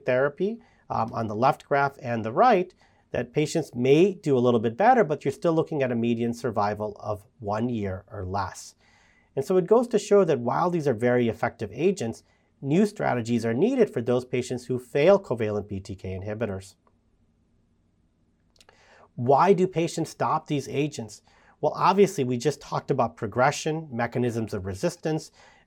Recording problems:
none

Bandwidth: 17 kHz